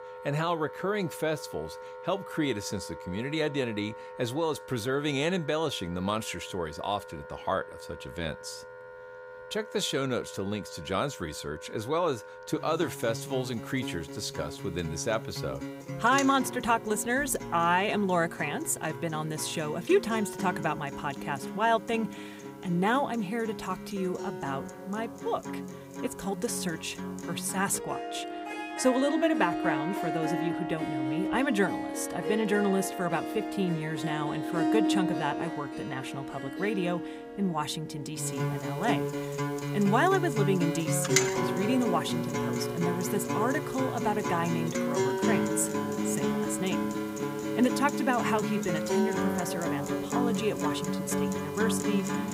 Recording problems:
background music; loud; throughout; 3 dB below the speech

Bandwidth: 15.5 kHz